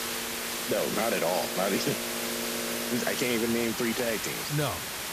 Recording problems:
train or aircraft noise; loud; throughout; 8 dB below the speech
hiss; loud; throughout; 2 dB below the speech

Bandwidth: 14.5 kHz